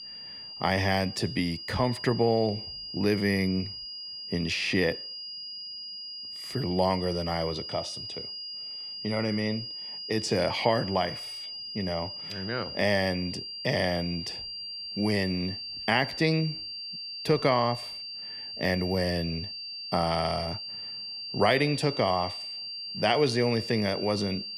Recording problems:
high-pitched whine; loud; throughout; 4.5 kHz, 7 dB below the speech

